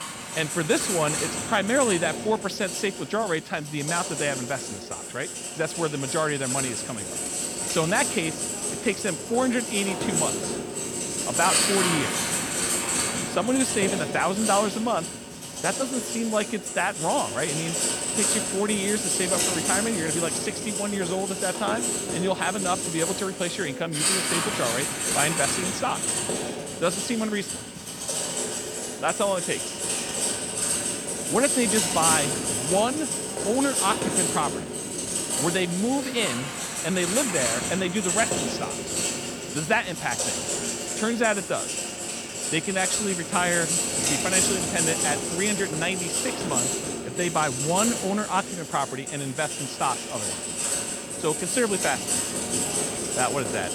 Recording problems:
household noises; very loud; throughout; 1 dB above the speech

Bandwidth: 18 kHz